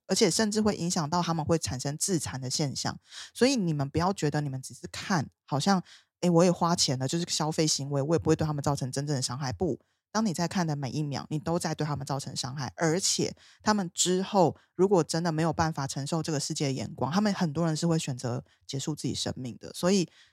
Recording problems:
none

